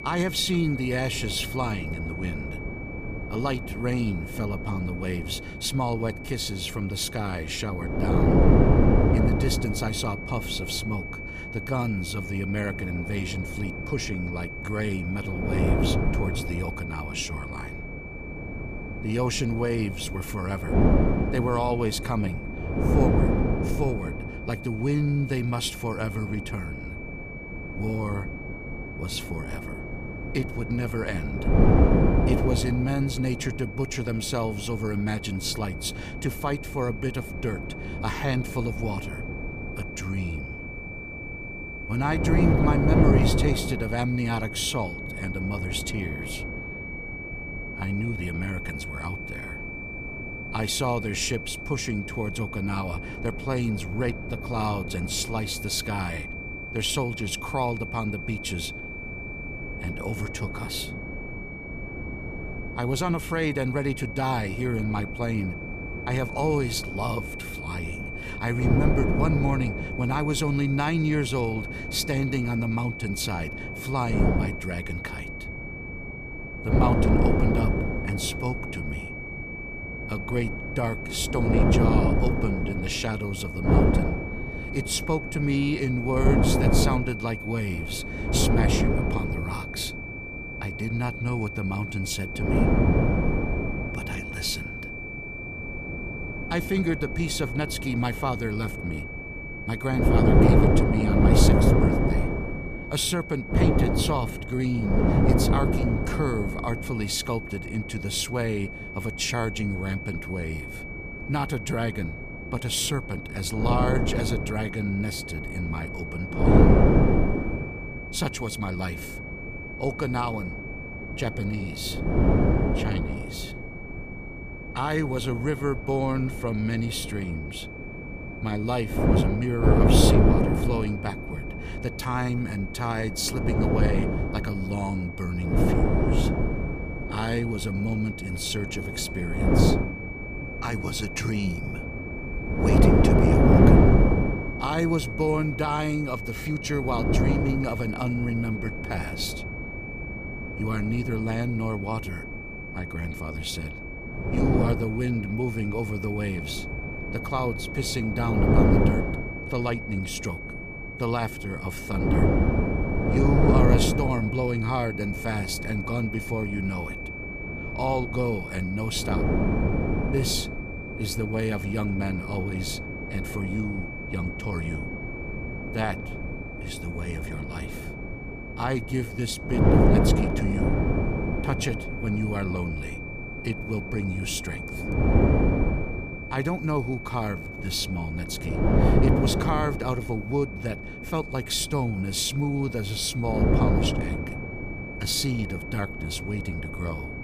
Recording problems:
wind noise on the microphone; heavy; as loud as the speech
high-pitched whine; loud; throughout; 2.5 kHz, 8 dB below the speech

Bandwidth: 15 kHz